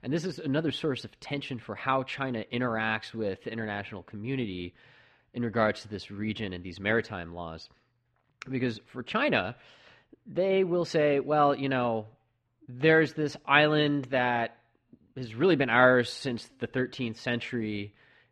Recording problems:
muffled; slightly; fading above 2.5 kHz

